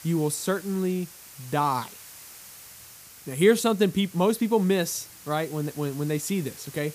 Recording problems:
hiss; noticeable; throughout; 20 dB below the speech

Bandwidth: 15 kHz